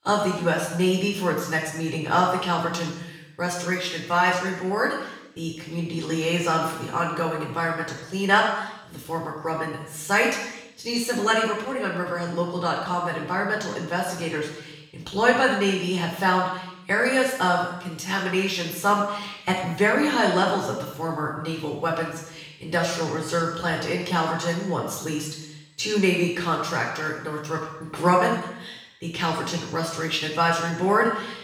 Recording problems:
off-mic speech; far
room echo; noticeable; dies away in 0.9 s

